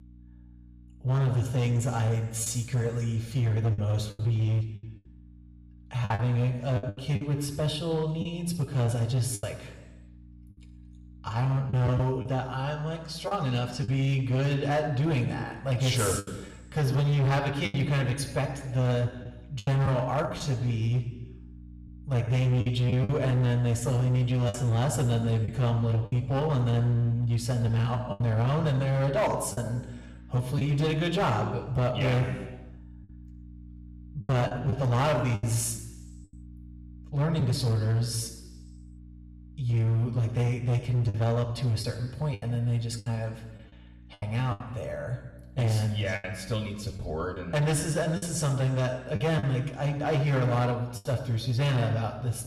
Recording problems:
room echo; slight; dies away in 1.1 s
distortion; slight; 12% of the sound clipped
off-mic speech; somewhat distant
electrical hum; faint; throughout; 60 Hz, 30 dB below the speech
choppy; very; 5% of the speech affected

